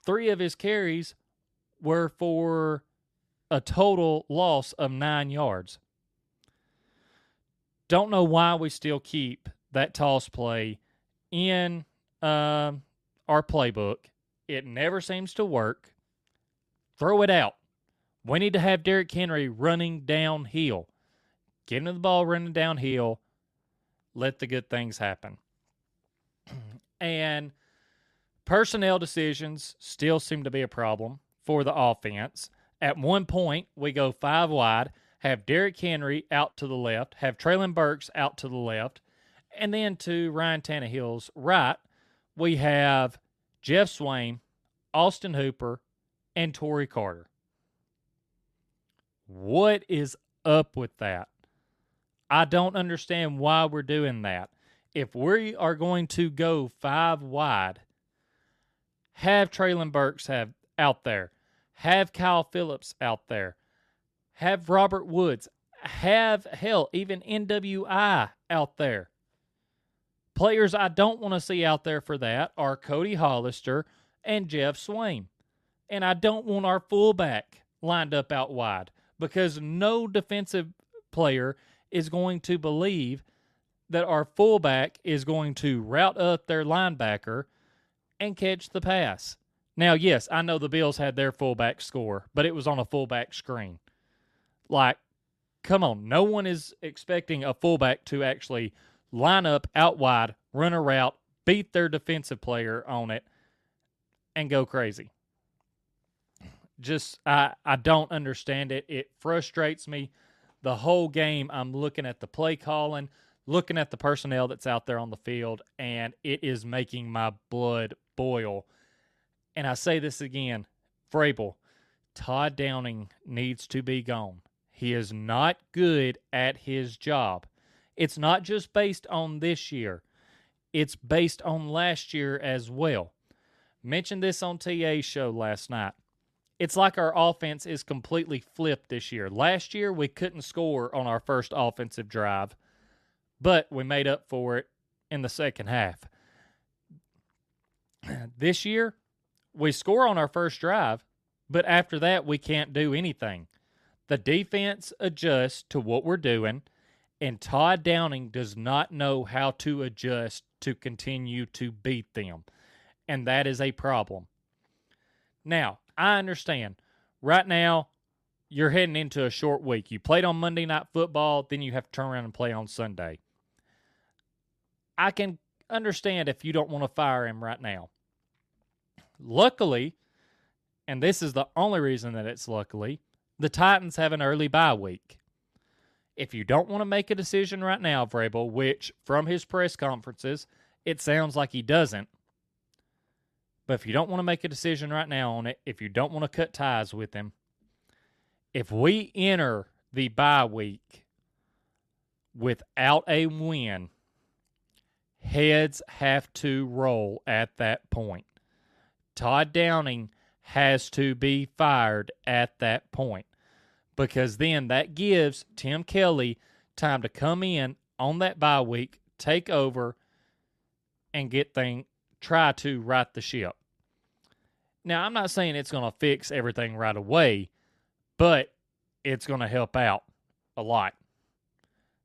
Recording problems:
none

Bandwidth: 13.5 kHz